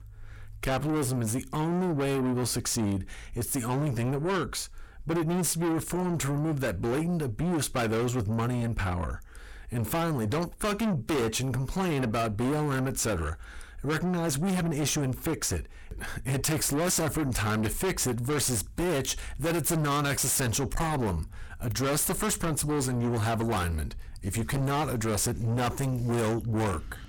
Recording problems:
distortion; heavy; 5 dB below the speech

